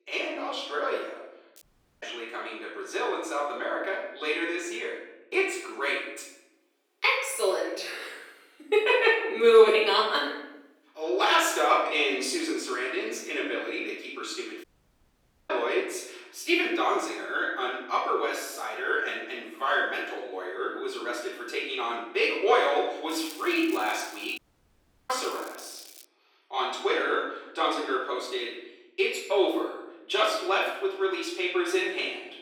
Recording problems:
off-mic speech; far
room echo; noticeable; dies away in 0.9 s
thin; somewhat; fading below 350 Hz
crackling; faint; at 1.5 s and from 23 to 26 s; 20 dB below the speech
audio cutting out; at 1.5 s, at 15 s for 1 s and at 24 s for 0.5 s

